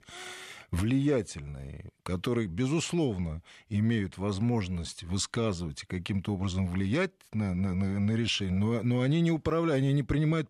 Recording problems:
none

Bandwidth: 13.5 kHz